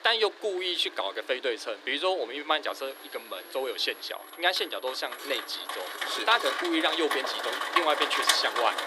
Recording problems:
thin; very; fading below 300 Hz
rain or running water; loud; throughout; 1 dB below the speech
high-pitched whine; faint; from 2.5 to 6 s; 11.5 kHz, 20 dB below the speech
background music; faint; throughout; 25 dB below the speech
clattering dishes; noticeable; from 4.5 to 6.5 s; peak 7 dB below the speech

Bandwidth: 13.5 kHz